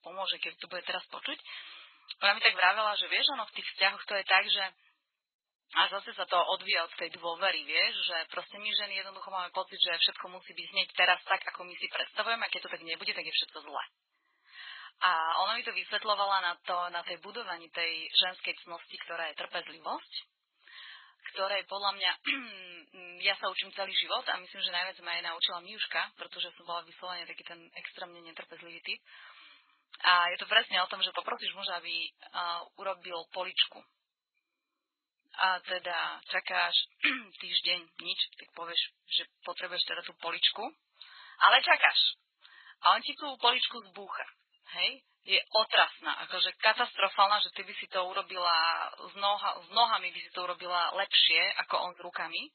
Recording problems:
garbled, watery; badly; nothing above 4 kHz
thin; very; fading below 750 Hz

